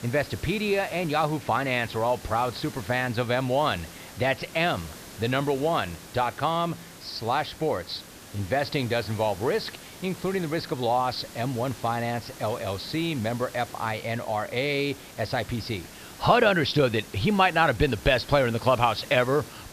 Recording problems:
high frequencies cut off; noticeable; nothing above 5.5 kHz
hiss; noticeable; throughout; 15 dB below the speech

